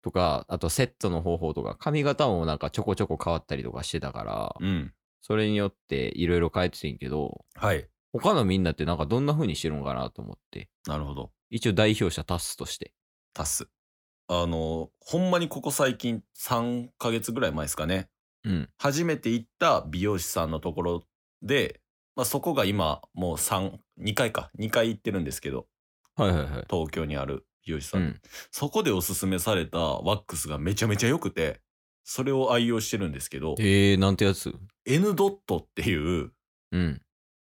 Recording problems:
none

